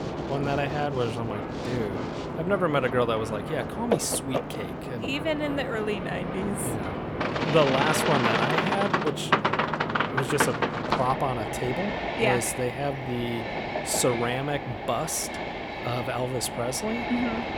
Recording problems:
train or aircraft noise; loud; throughout; 1 dB below the speech

